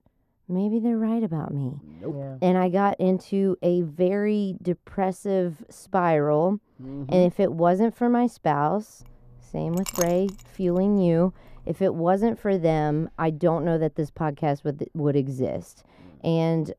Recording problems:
muffled; very; fading above 1.5 kHz
clattering dishes; noticeable; from 10 to 12 s; peak 7 dB below the speech

